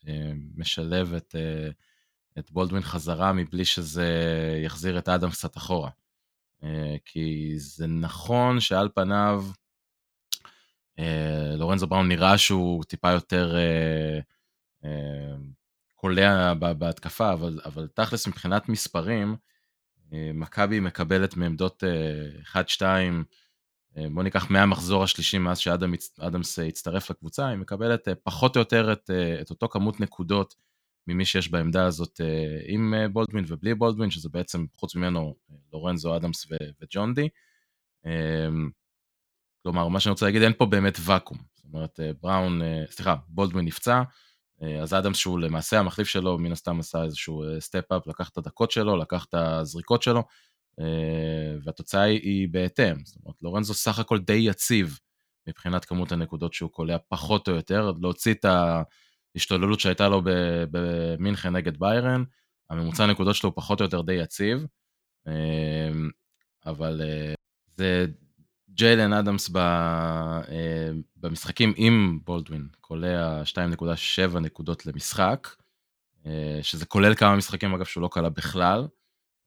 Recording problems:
choppy; occasionally; from 33 to 37 s; 1% of the speech affected

